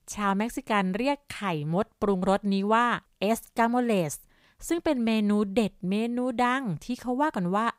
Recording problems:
none

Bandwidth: 15.5 kHz